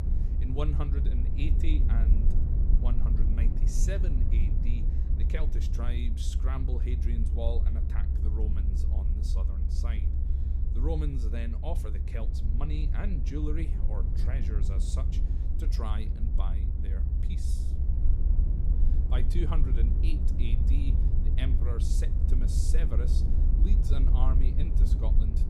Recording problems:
low rumble; loud; throughout; 3 dB below the speech

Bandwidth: 15.5 kHz